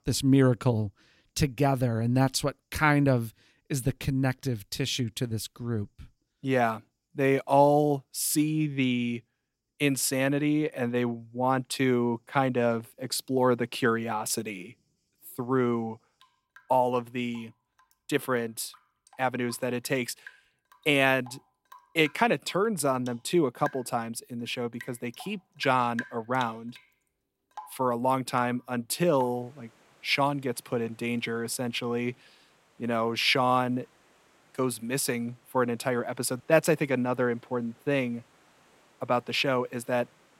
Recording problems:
rain or running water; faint; throughout; 25 dB below the speech

